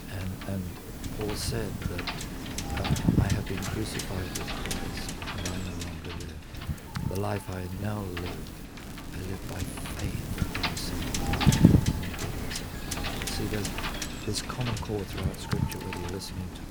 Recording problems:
wind noise on the microphone; heavy; 5 dB above the speech
hiss; noticeable; until 4.5 s, from 6.5 to 8.5 s and from 10 to 14 s; 15 dB below the speech
crackling; very faint; from 9 to 11 s, at 11 s and at 13 s; 15 dB below the speech

